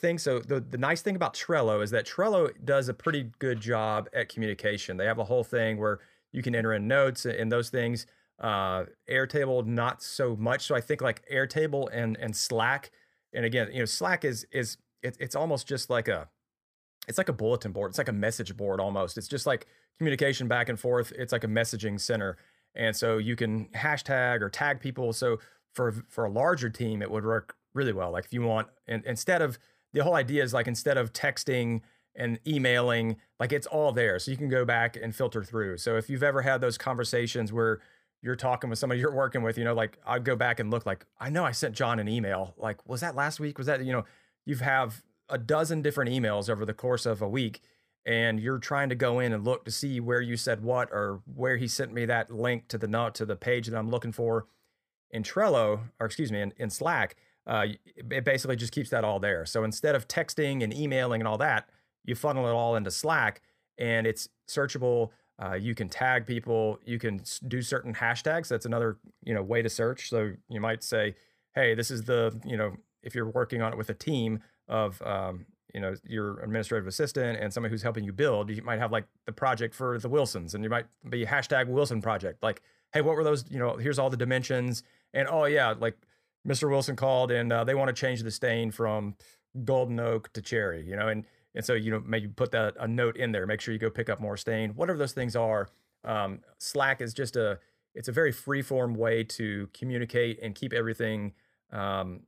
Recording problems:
none

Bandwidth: 15 kHz